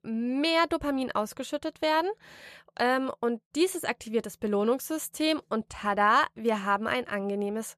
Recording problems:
none

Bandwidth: 13.5 kHz